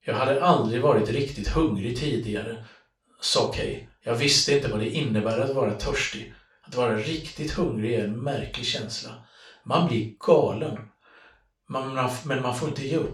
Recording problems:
off-mic speech; far
room echo; noticeable; dies away in 0.3 s

